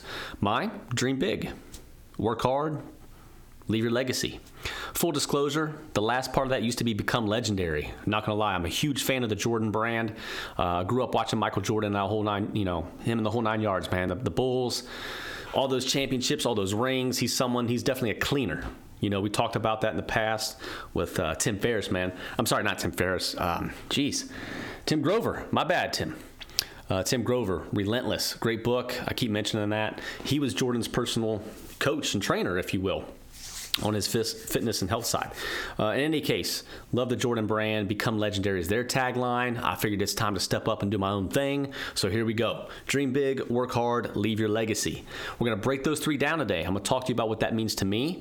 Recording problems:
squashed, flat; heavily

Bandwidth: 18.5 kHz